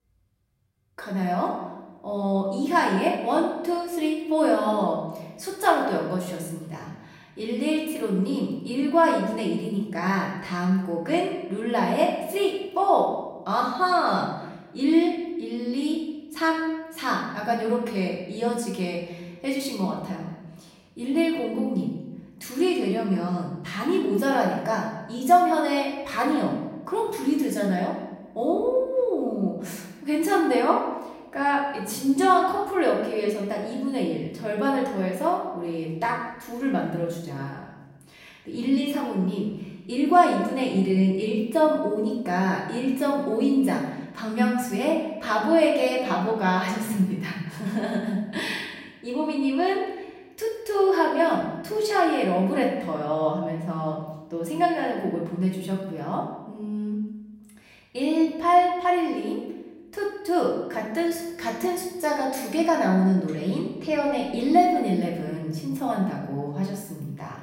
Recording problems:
off-mic speech; far
room echo; noticeable; dies away in 0.9 s

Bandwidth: 16 kHz